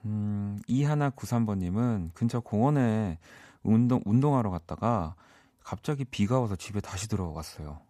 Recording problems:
none

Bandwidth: 14.5 kHz